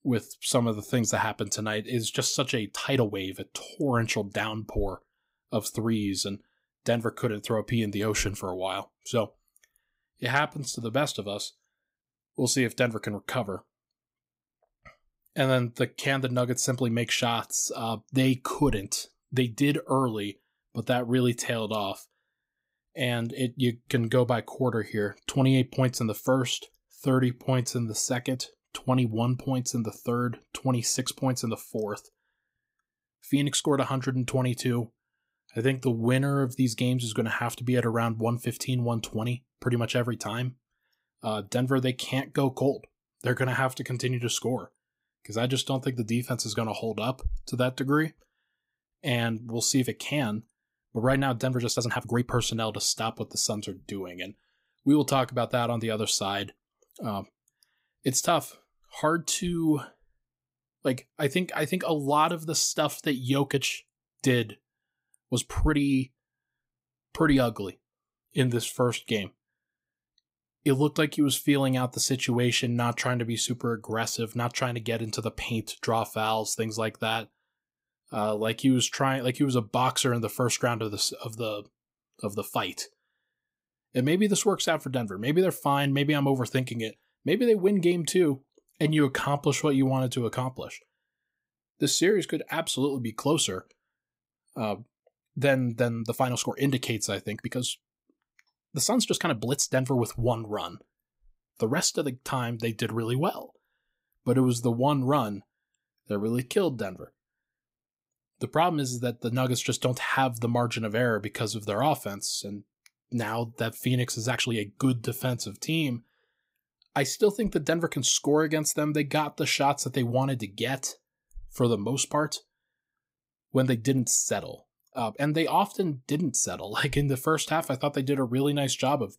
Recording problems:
uneven, jittery; strongly; from 2.5 s to 2:05

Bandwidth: 15.5 kHz